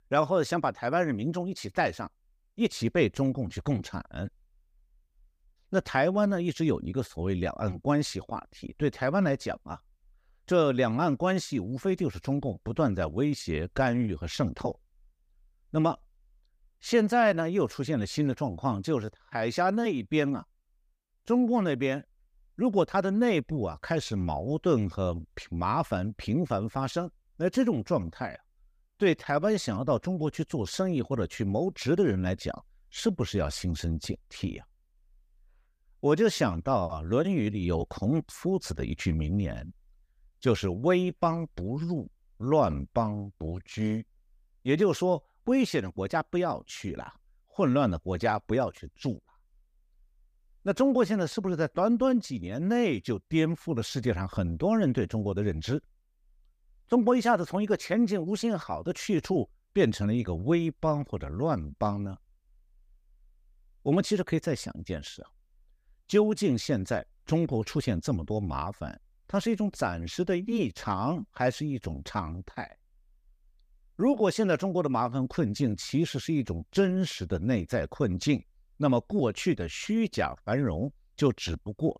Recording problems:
none

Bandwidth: 15 kHz